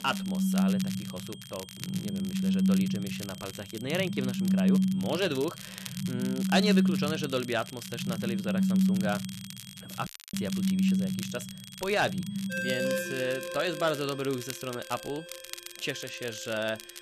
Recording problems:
alarms or sirens; very loud; throughout; 4 dB above the speech
high-pitched whine; noticeable; throughout; 3.5 kHz, 15 dB below the speech
crackle, like an old record; noticeable; 10 dB below the speech
audio cutting out; at 10 s

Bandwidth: 14 kHz